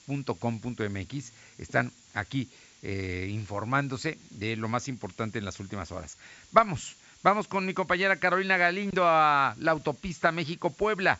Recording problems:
high frequencies cut off; noticeable; nothing above 8 kHz
hiss; faint; throughout; 25 dB below the speech

